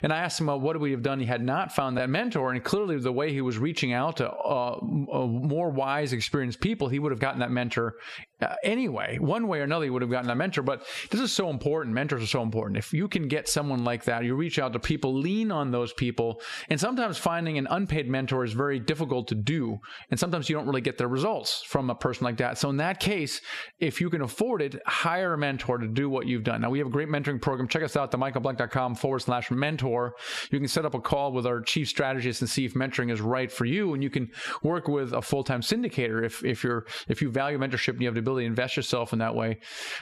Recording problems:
squashed, flat; somewhat

